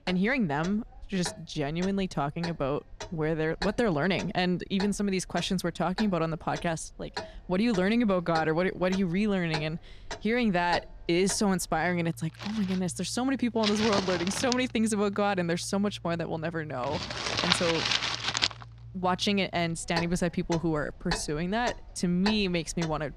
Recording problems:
household noises; loud; throughout; 6 dB below the speech

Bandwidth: 14.5 kHz